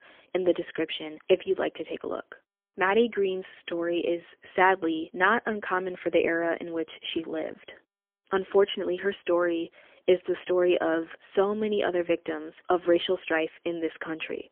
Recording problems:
phone-call audio; poor line; nothing above 3.5 kHz

